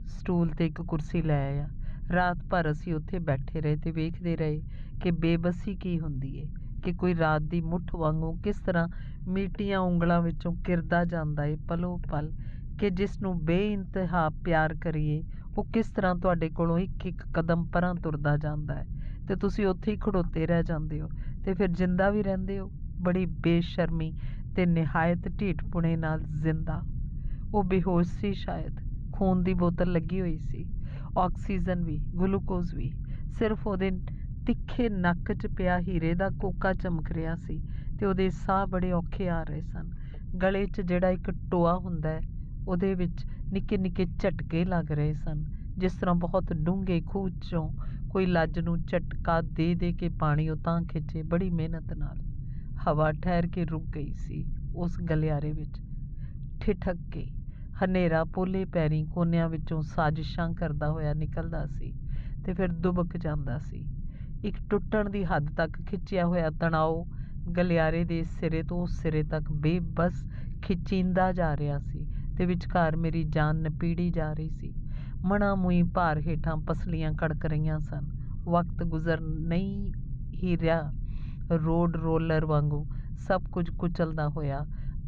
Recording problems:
muffled; very; fading above 3 kHz
low rumble; faint; throughout; 20 dB below the speech

